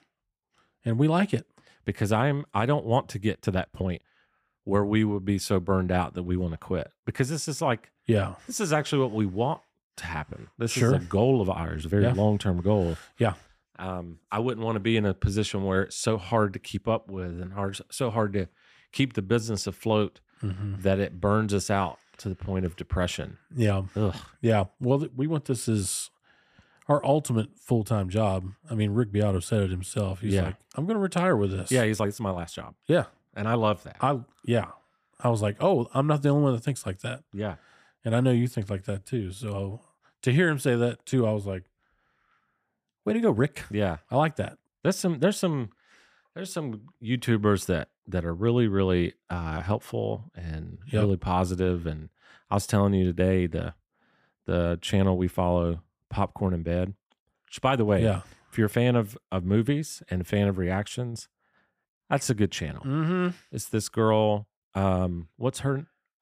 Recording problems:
uneven, jittery; strongly; from 3 to 50 s

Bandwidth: 15 kHz